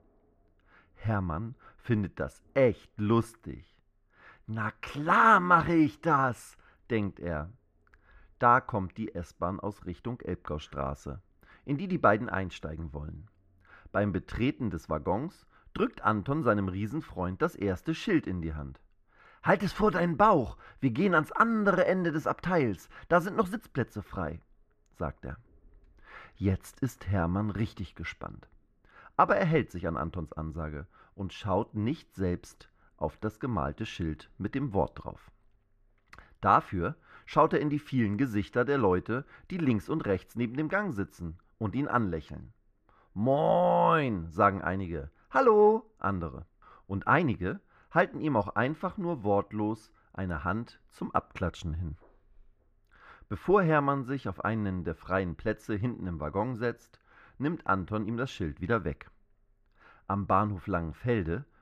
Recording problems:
muffled; very; fading above 3.5 kHz

